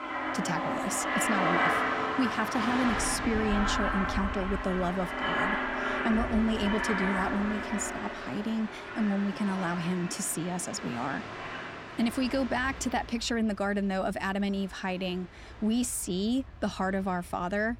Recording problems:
train or aircraft noise; loud; throughout; 1 dB below the speech

